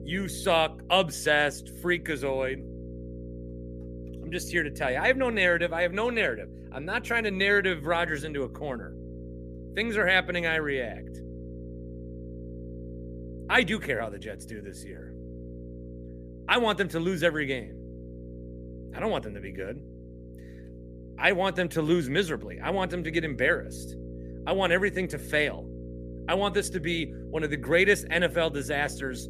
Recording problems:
electrical hum; faint; throughout; 60 Hz, 20 dB below the speech

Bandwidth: 14.5 kHz